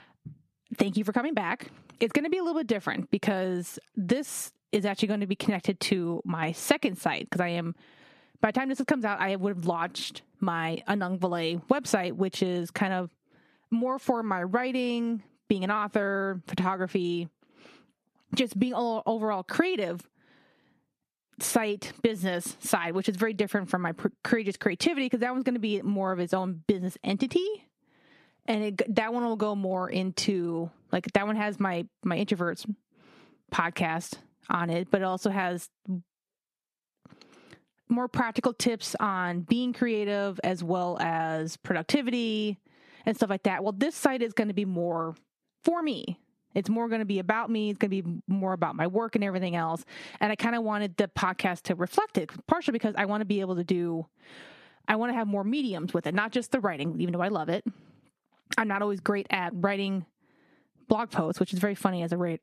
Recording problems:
squashed, flat; heavily

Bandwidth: 14 kHz